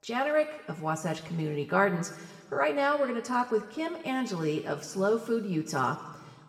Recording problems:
room echo; slight; dies away in 1.4 s
off-mic speech; somewhat distant

